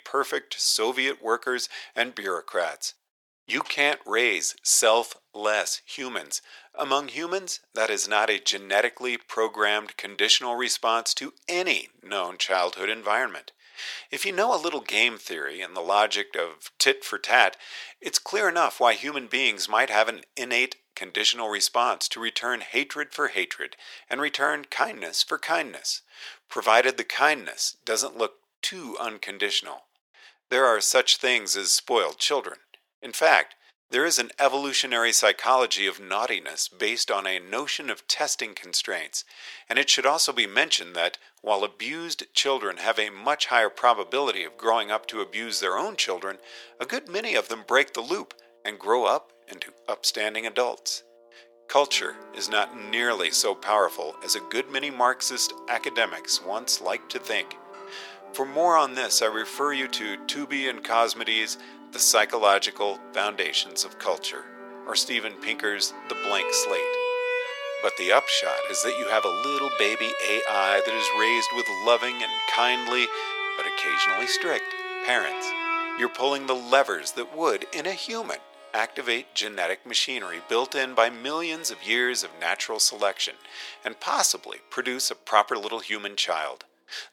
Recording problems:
thin; very; fading below 550 Hz
background music; loud; from 43 s on; 7 dB below the speech

